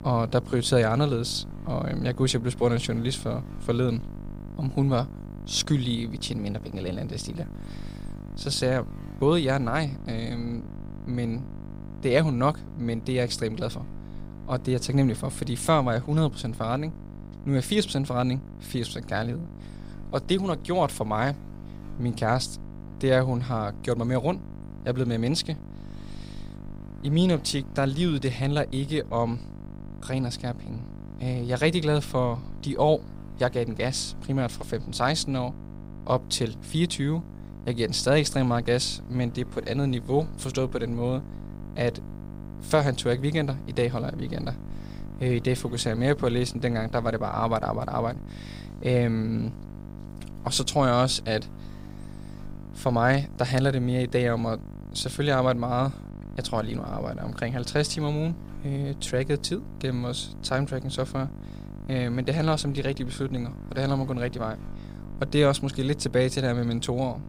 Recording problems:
electrical hum; noticeable; throughout; 50 Hz, 20 dB below the speech

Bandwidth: 15.5 kHz